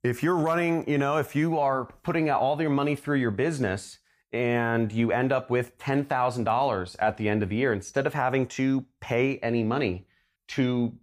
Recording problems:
none

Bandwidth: 15 kHz